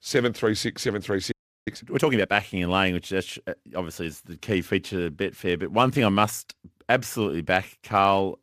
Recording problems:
audio freezing; at 1.5 s

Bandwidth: 14.5 kHz